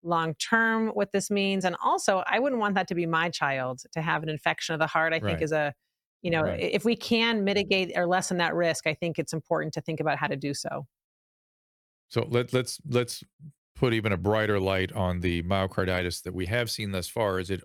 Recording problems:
none

